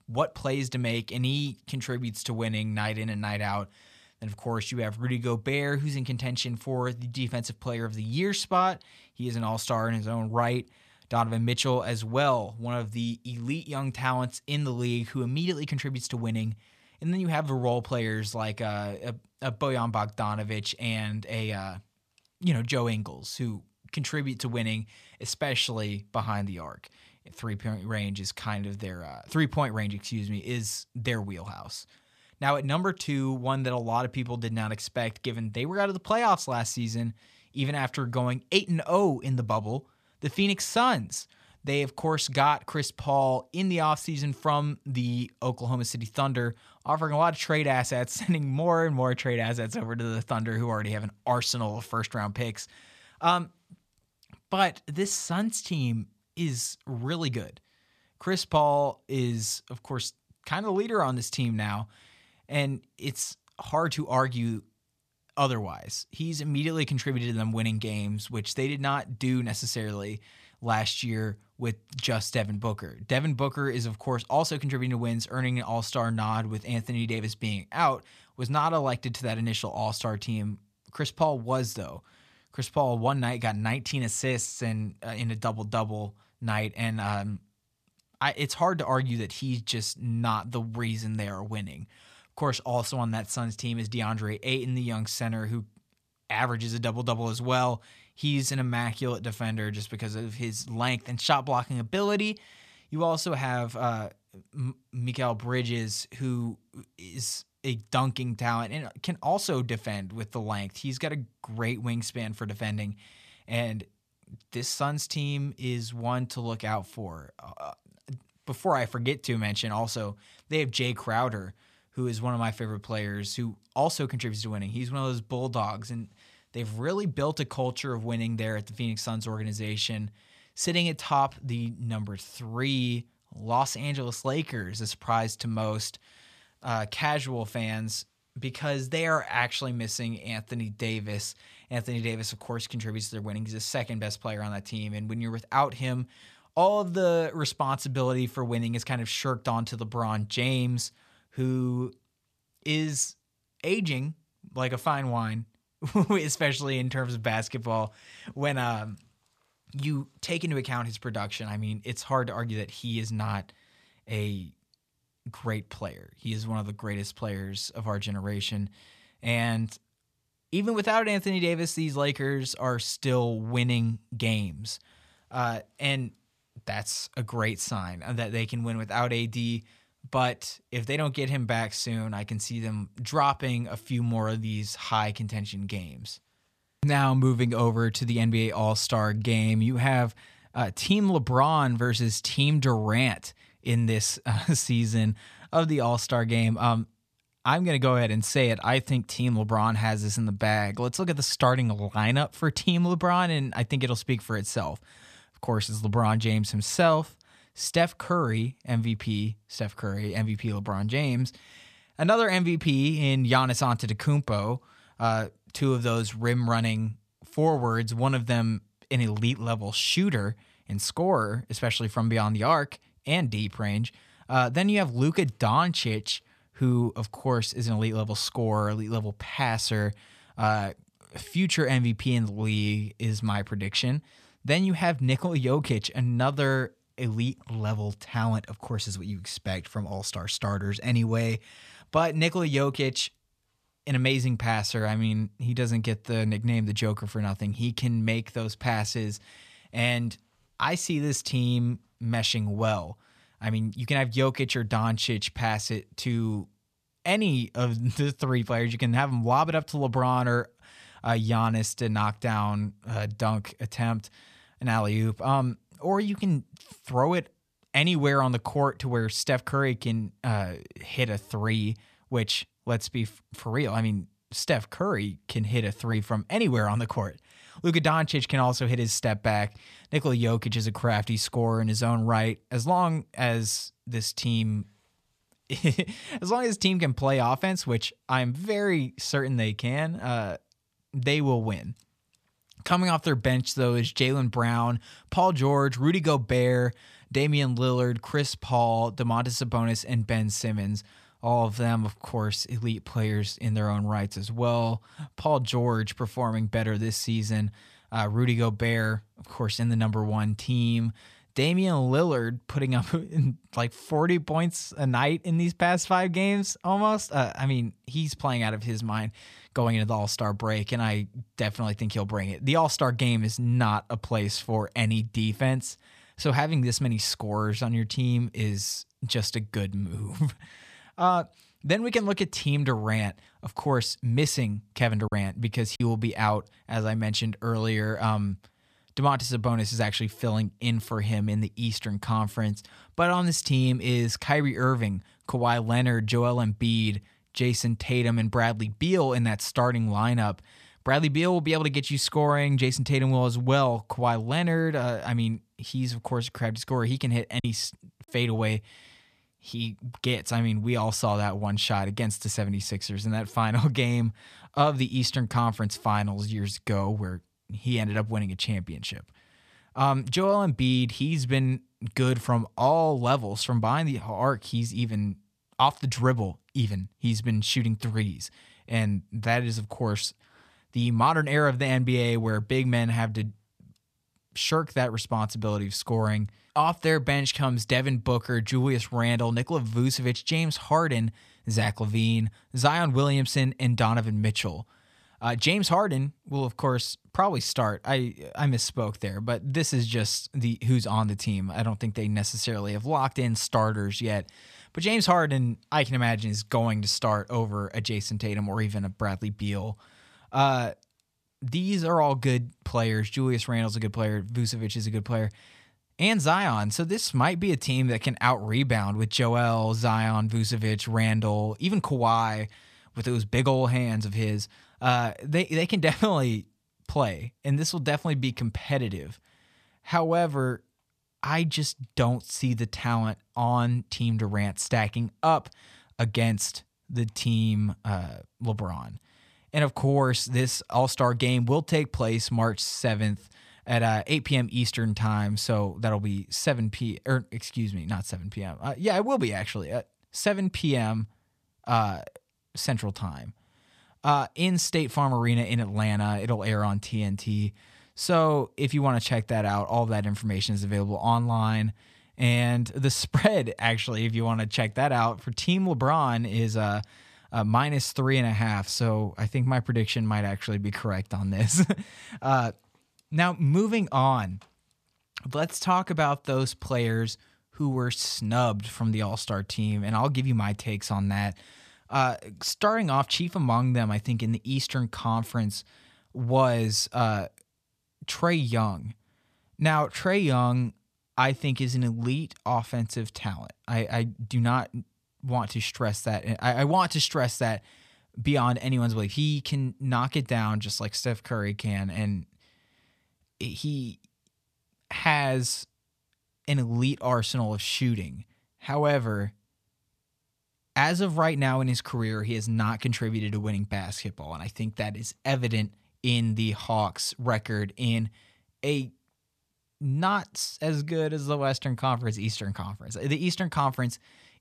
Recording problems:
choppy; occasionally; at 5:35 and at 5:57; 2% of the speech affected

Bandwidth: 14.5 kHz